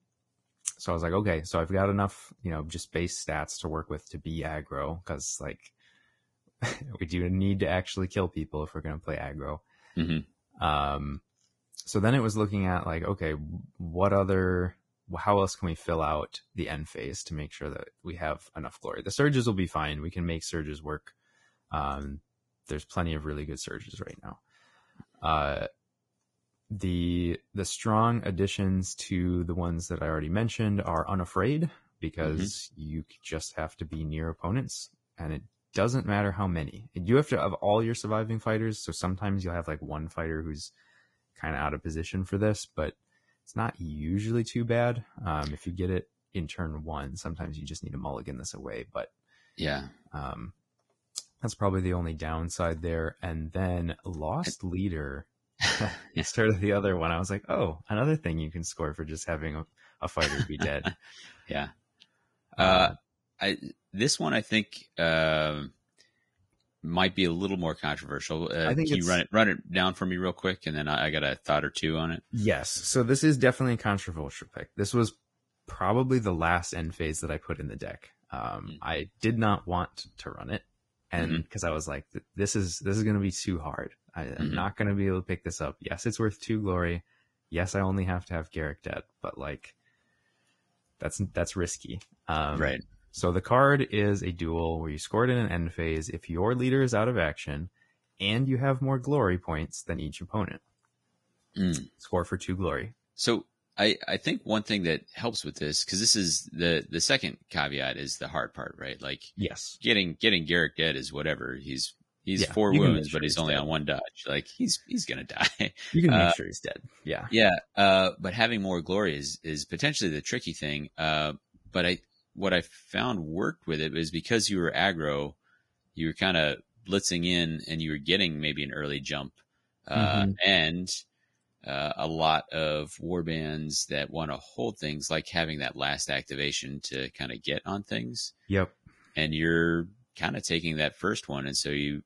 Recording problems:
garbled, watery; badly; nothing above 10.5 kHz

